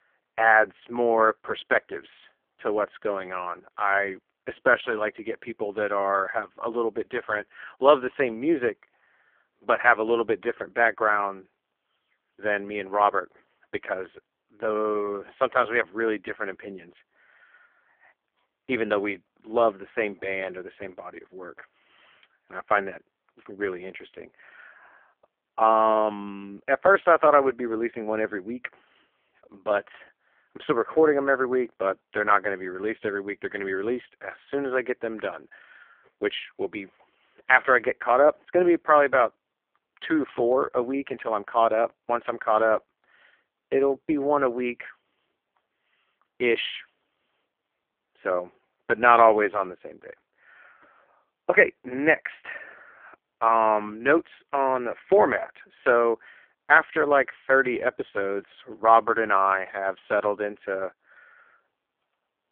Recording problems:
phone-call audio; poor line; nothing above 3.5 kHz

